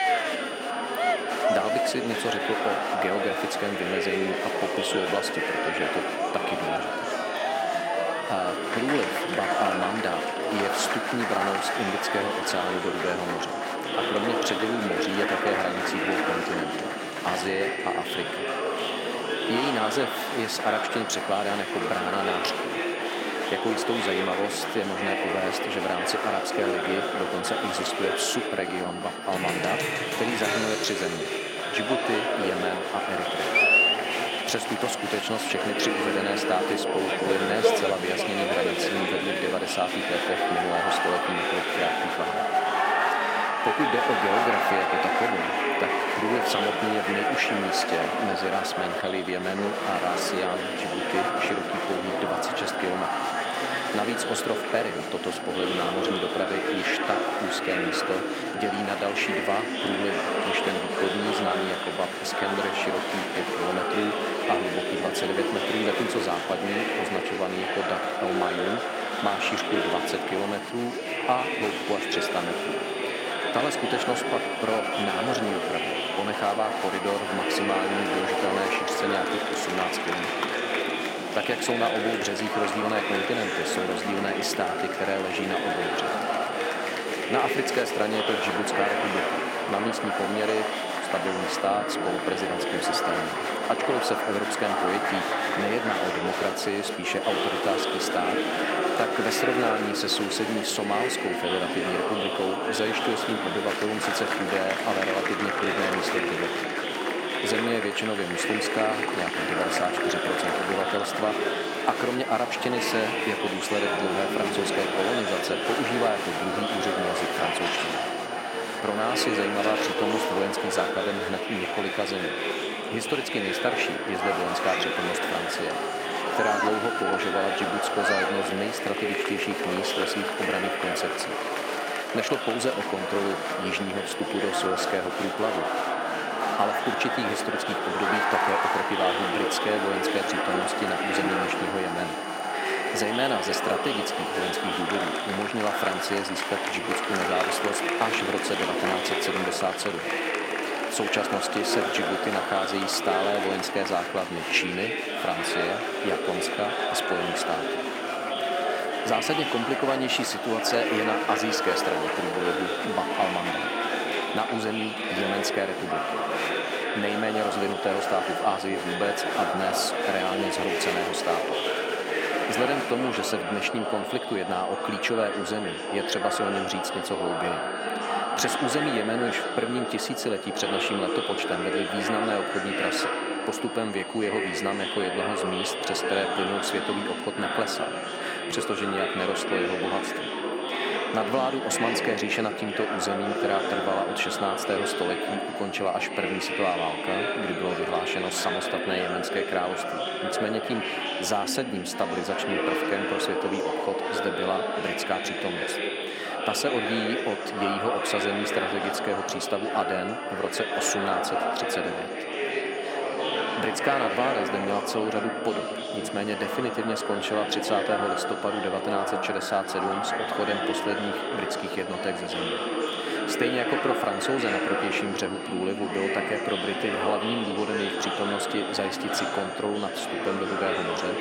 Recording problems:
thin; somewhat; fading below 300 Hz
murmuring crowd; very loud; throughout; 2 dB above the speech
high-pitched whine; noticeable; throughout; 3 kHz, 15 dB below the speech

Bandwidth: 16.5 kHz